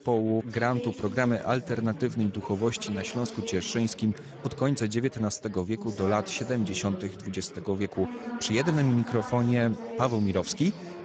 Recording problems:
garbled, watery; badly; nothing above 7.5 kHz
chatter from many people; noticeable; throughout; 10 dB below the speech

